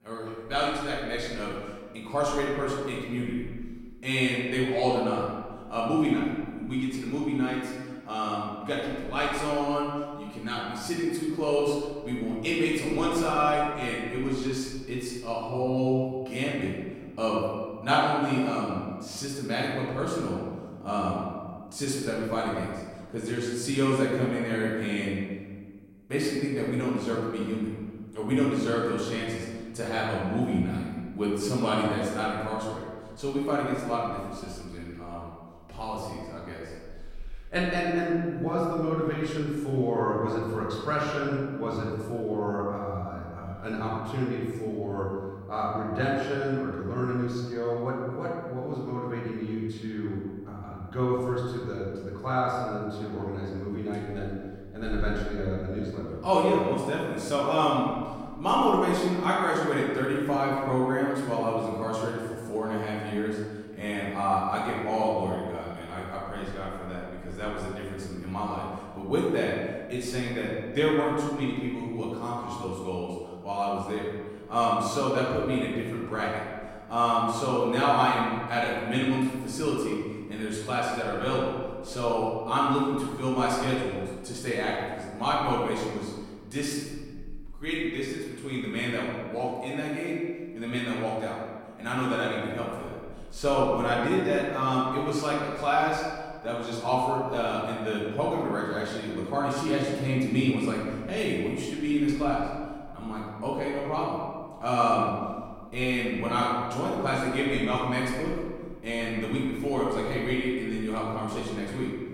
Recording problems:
off-mic speech; far
room echo; noticeable; dies away in 1.4 s

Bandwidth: 16 kHz